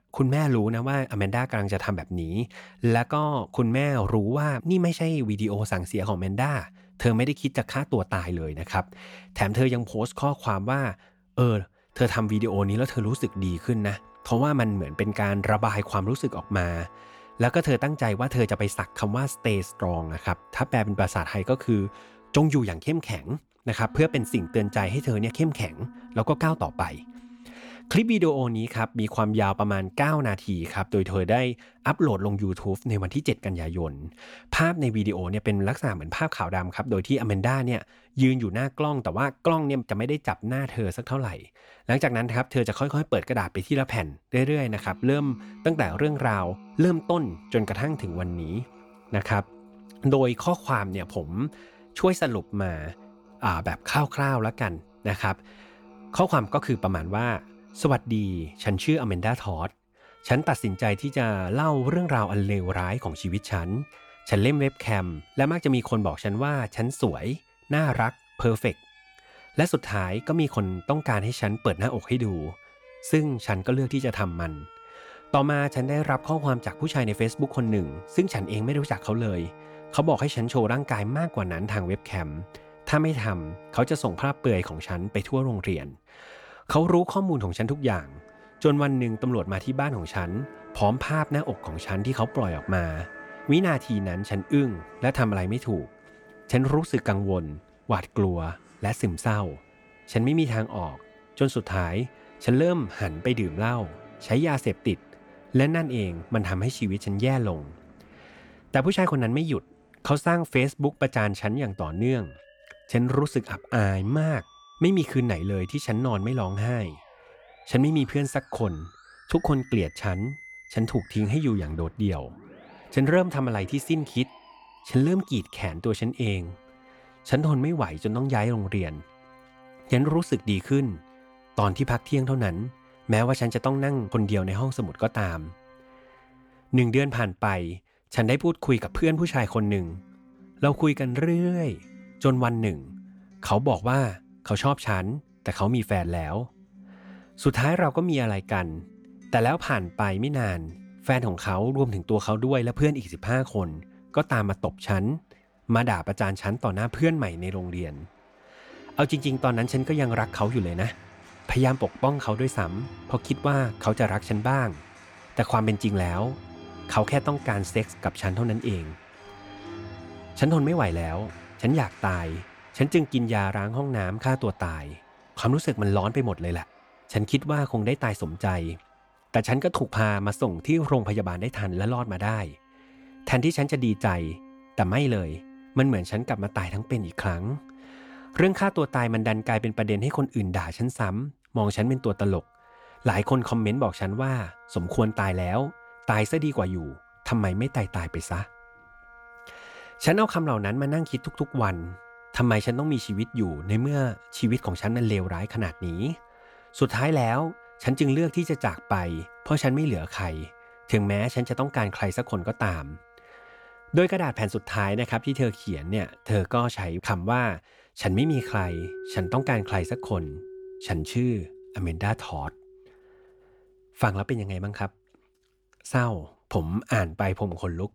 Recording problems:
background music; faint; throughout; 20 dB below the speech

